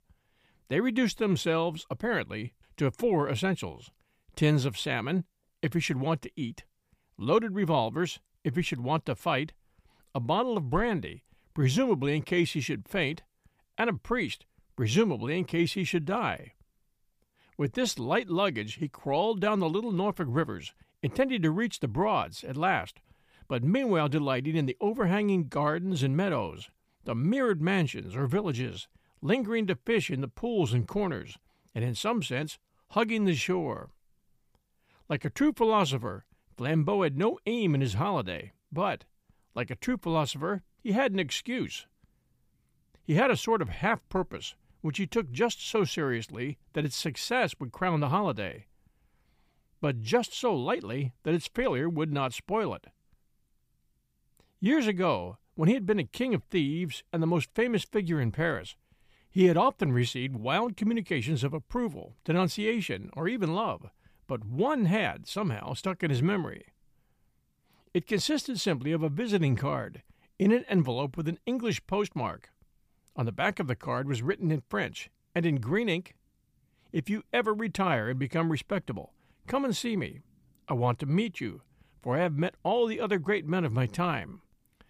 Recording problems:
none

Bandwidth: 15 kHz